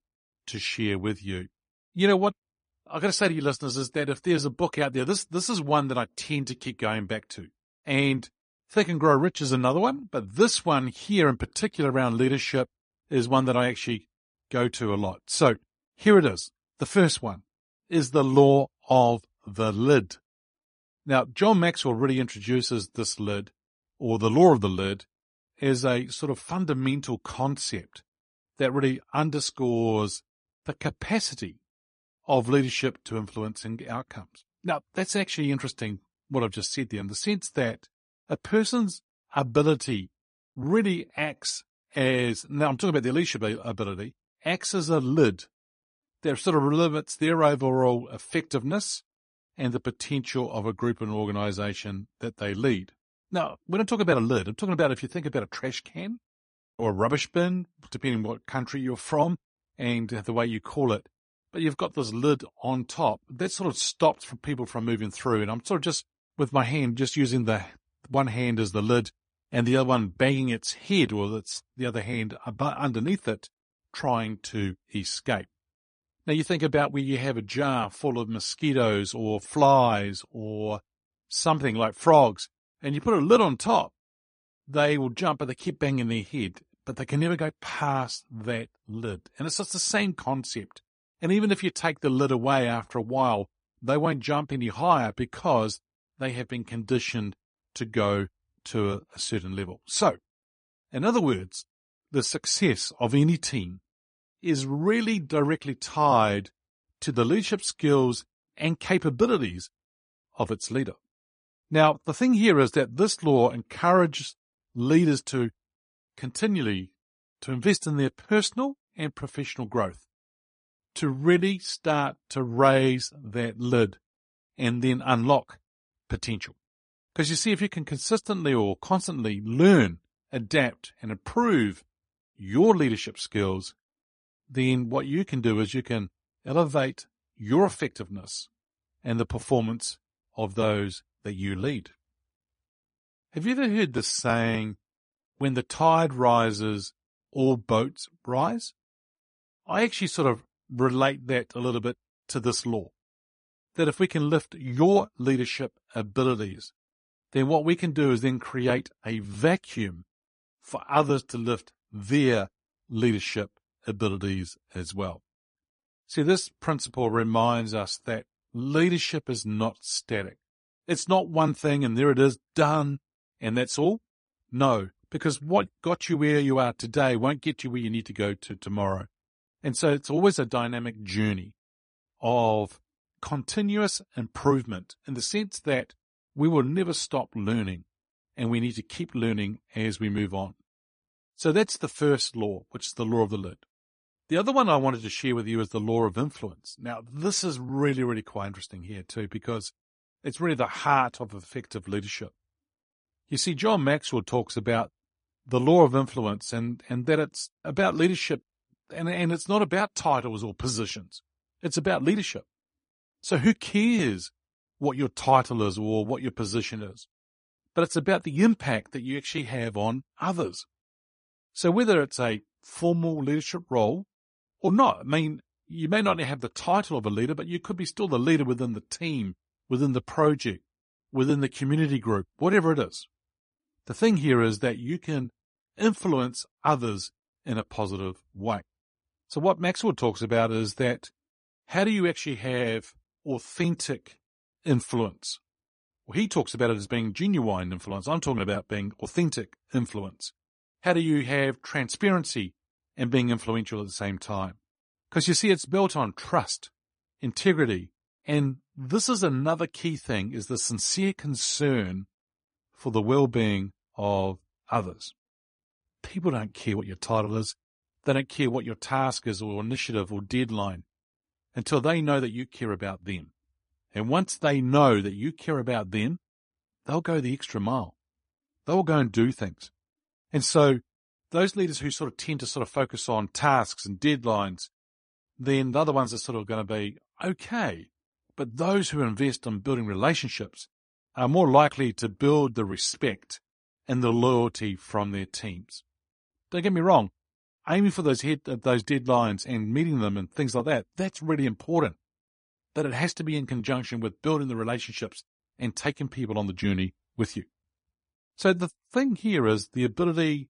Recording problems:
garbled, watery; slightly; nothing above 10 kHz

